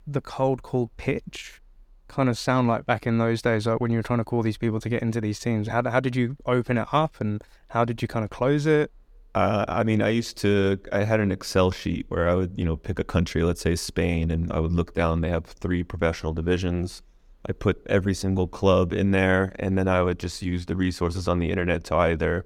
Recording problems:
none

